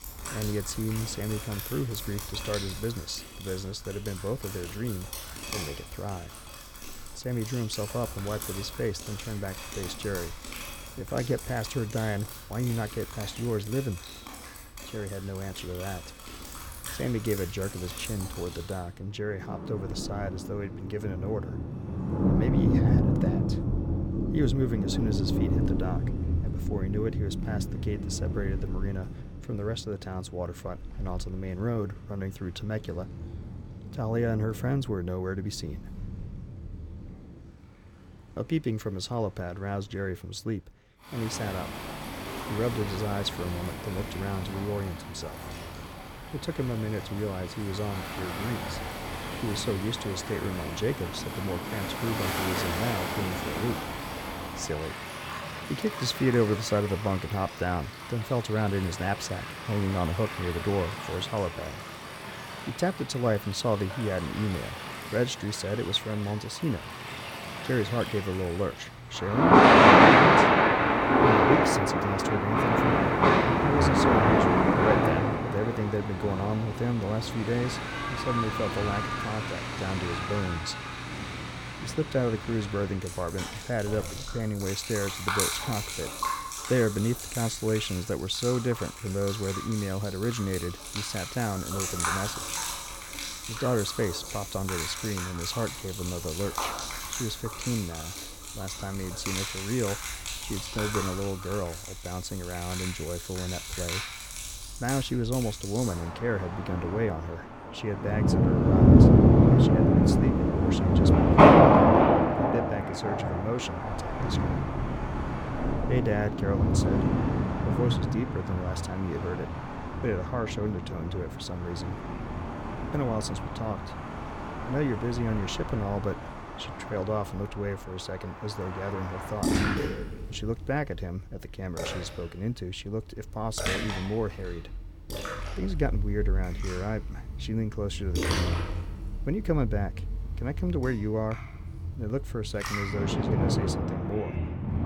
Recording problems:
rain or running water; very loud; throughout; 5 dB above the speech

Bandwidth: 17.5 kHz